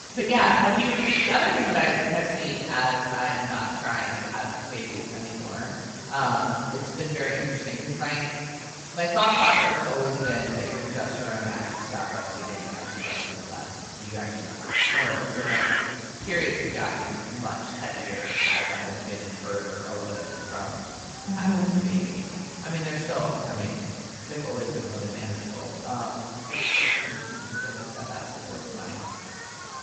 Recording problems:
room echo; strong; dies away in 2.2 s
off-mic speech; far
garbled, watery; badly; nothing above 8 kHz
echo of what is said; faint; from 10 s on; 440 ms later, 25 dB below the speech
hiss; loud; throughout; 3 dB below the speech

